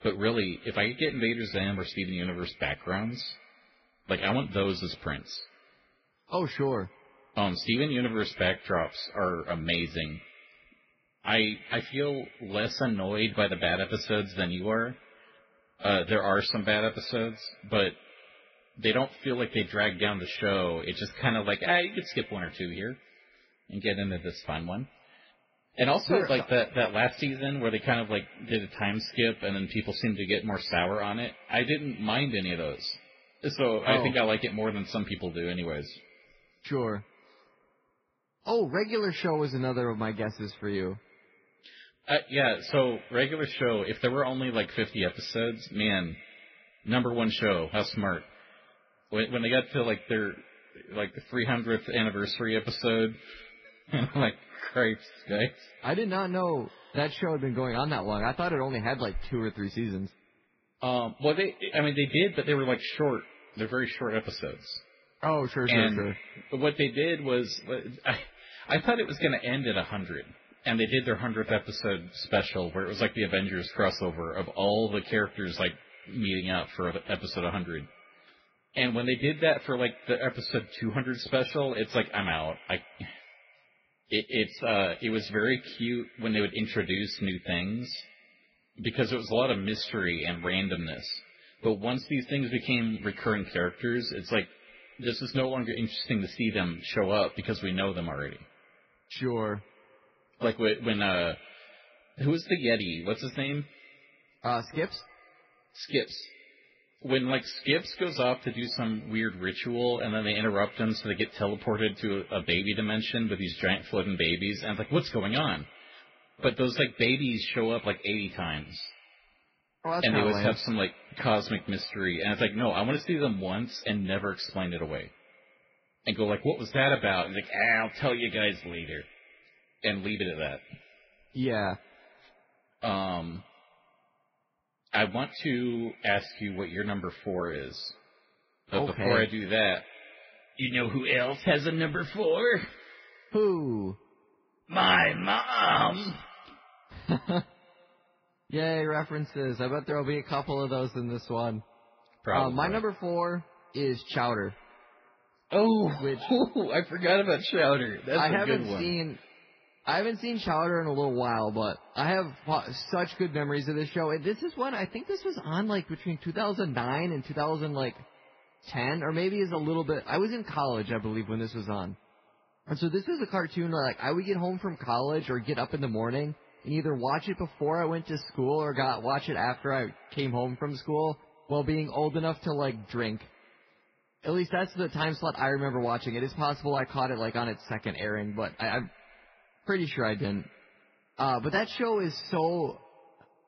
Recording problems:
garbled, watery; badly; nothing above 5.5 kHz
echo of what is said; faint; throughout; 130 ms later, 25 dB below the speech

